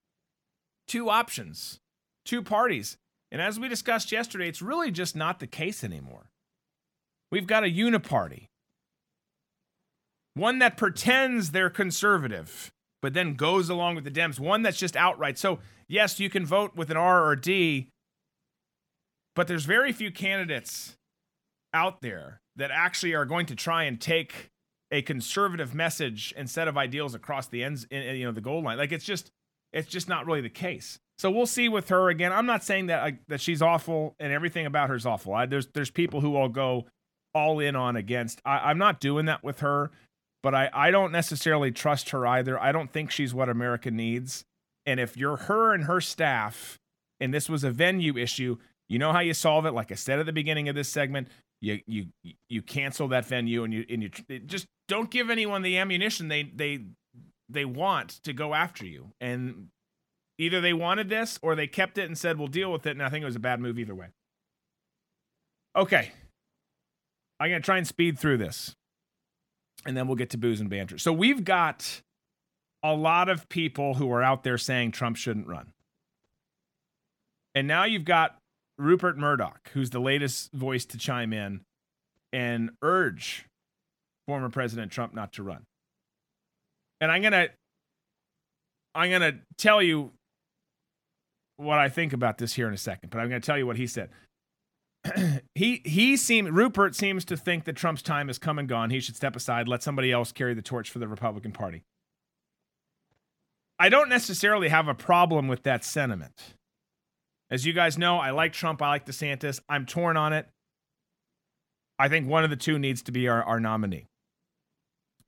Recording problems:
none

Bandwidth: 17 kHz